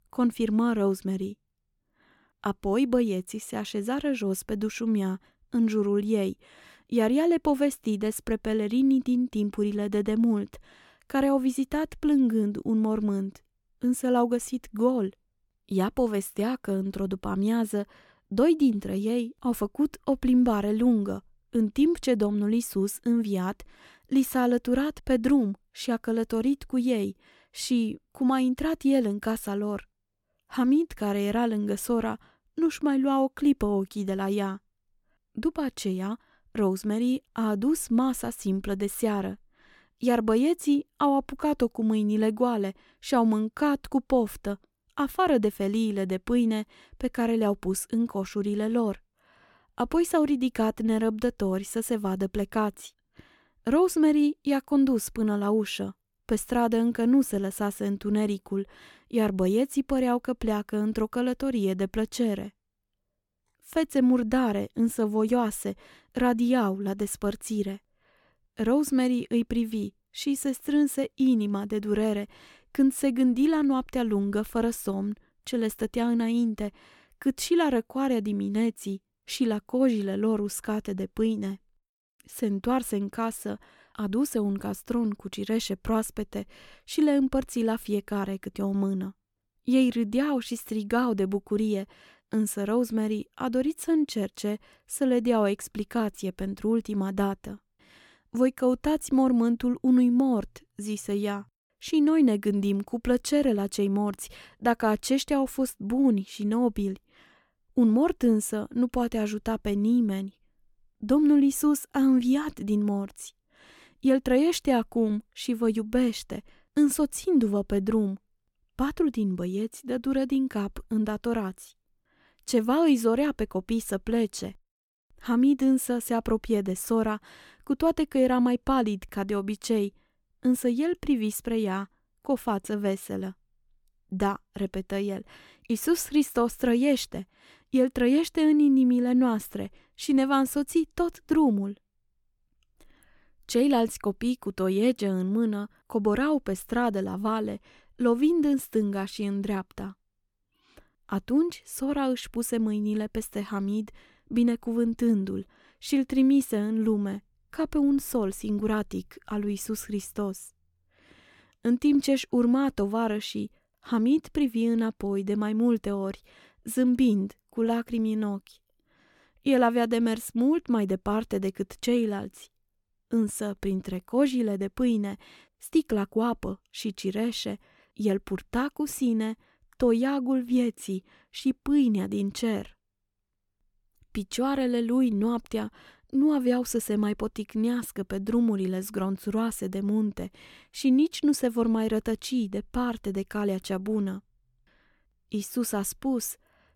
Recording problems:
none

